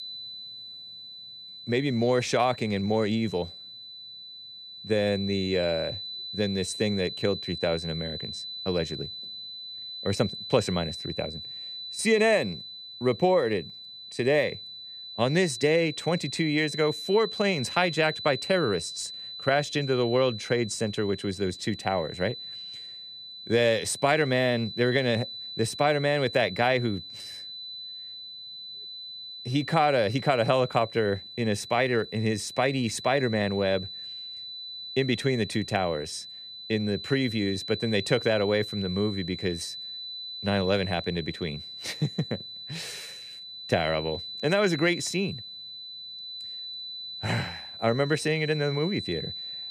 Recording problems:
high-pitched whine; loud; throughout; 4 kHz, 10 dB below the speech

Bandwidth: 14.5 kHz